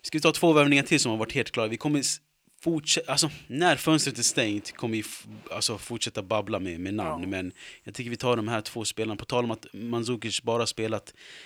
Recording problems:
thin; very slightly; fading below 900 Hz

